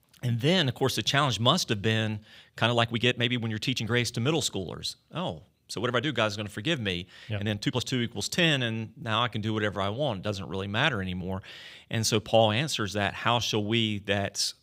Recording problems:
uneven, jittery; strongly; from 2.5 to 14 s

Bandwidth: 15.5 kHz